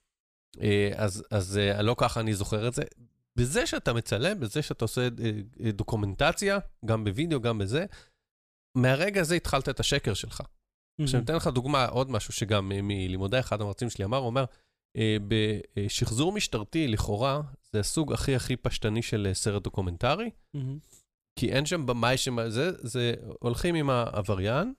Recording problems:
none

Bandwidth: 14.5 kHz